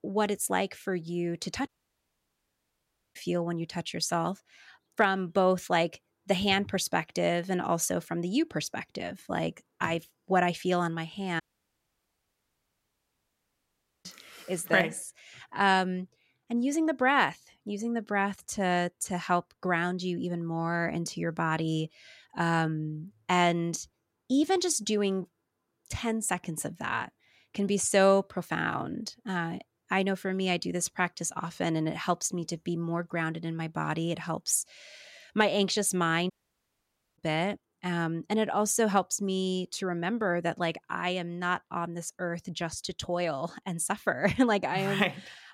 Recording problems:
audio cutting out; at 1.5 s for 1.5 s, at 11 s for 2.5 s and at 36 s for 1 s

